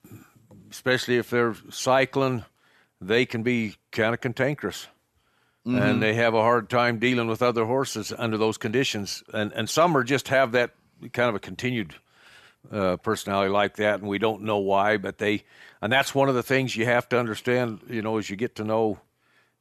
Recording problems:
none

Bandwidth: 13.5 kHz